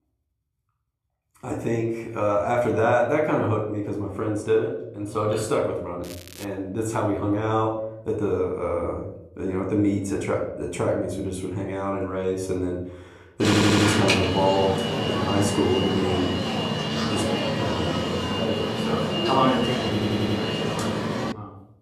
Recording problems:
room echo; slight; dies away in 0.7 s
off-mic speech; somewhat distant
crackling; noticeable; at 6 s; 20 dB below the speech
alarm; loud; from 13 s on; peak 5 dB above the speech
audio stuttering; at 13 s and at 20 s

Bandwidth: 14.5 kHz